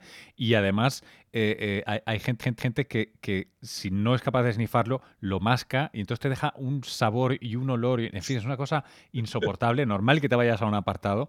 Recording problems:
audio stuttering; at 2 s

